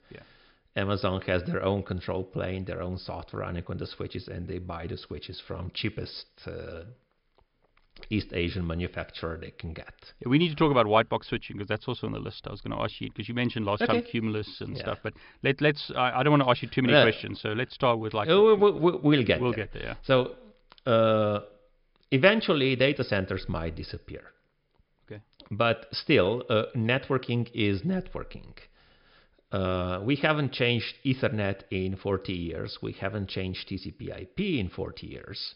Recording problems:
high frequencies cut off; noticeable; nothing above 5.5 kHz

